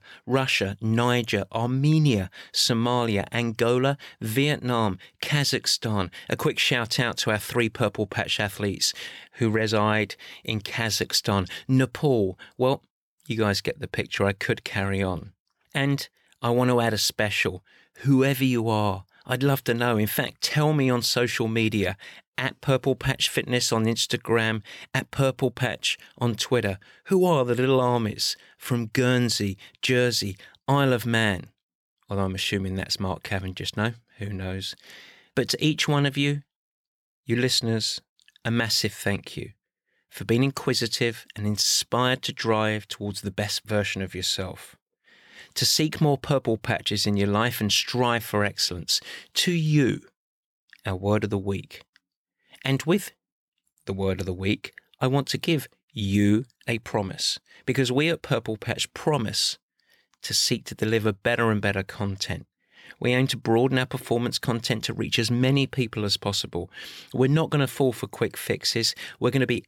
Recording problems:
none

